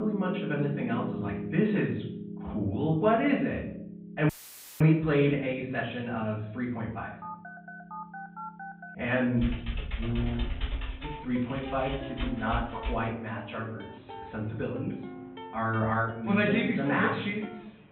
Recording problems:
off-mic speech; far
high frequencies cut off; severe; nothing above 3.5 kHz
room echo; slight; dies away in 0.6 s
background music; noticeable; throughout; 10 dB below the speech
abrupt cut into speech; at the start
audio cutting out; filled with static; at 4.5 s for 0.5 s
phone ringing; faint; from 7 to 9 s; peak 10 dB below the speech
keyboard typing; noticeable; from 9.5 to 13 s; peak 5 dB below the speech

